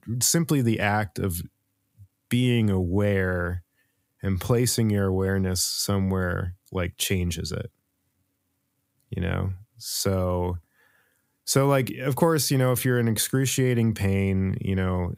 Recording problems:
none

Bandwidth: 15.5 kHz